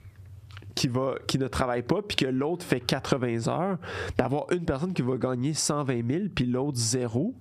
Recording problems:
squashed, flat; heavily

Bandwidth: 14.5 kHz